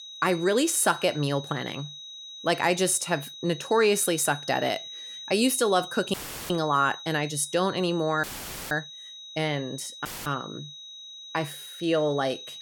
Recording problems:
high-pitched whine; noticeable; throughout; 4 kHz, 15 dB below the speech
audio cutting out; filled with static; at 6 s, at 8 s and at 10 s

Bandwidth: 17 kHz